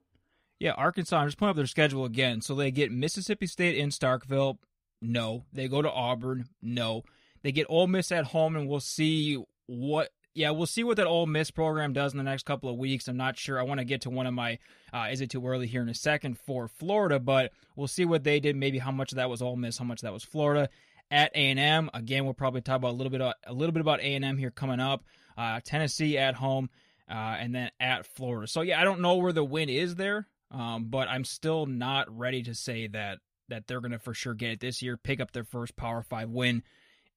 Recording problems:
none

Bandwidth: 15.5 kHz